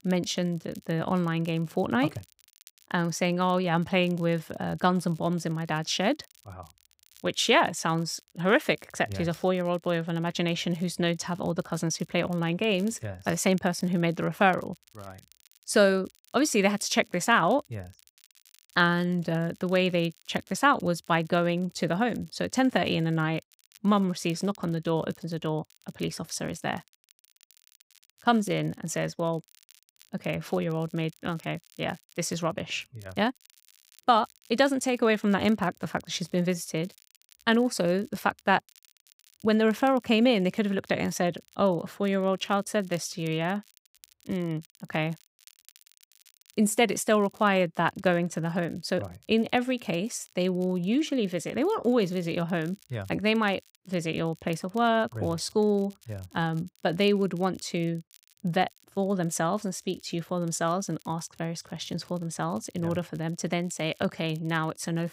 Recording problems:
crackle, like an old record; faint; 30 dB below the speech

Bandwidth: 15.5 kHz